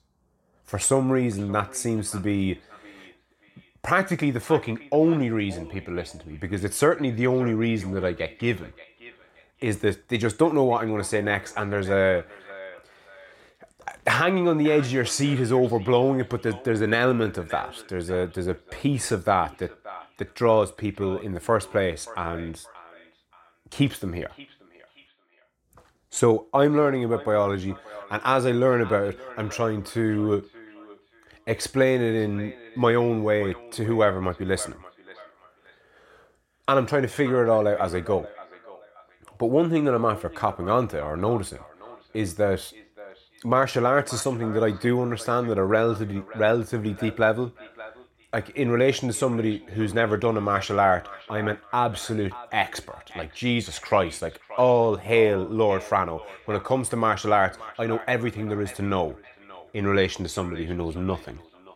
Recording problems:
echo of what is said; faint; throughout; 580 ms later, 20 dB below the speech

